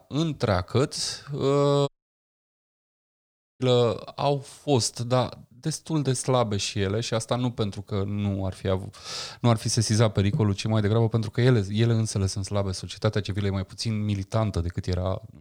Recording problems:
audio cutting out; at 2 s for 1.5 s

